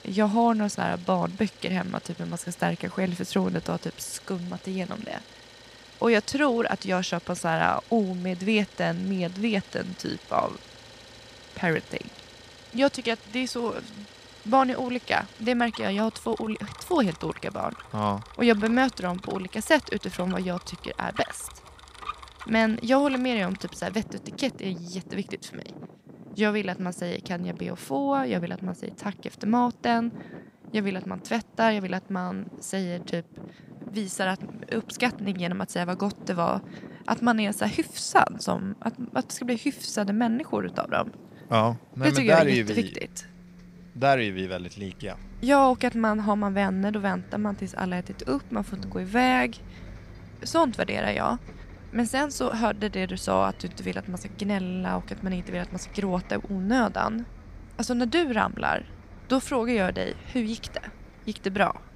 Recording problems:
traffic noise; noticeable; throughout; 20 dB below the speech

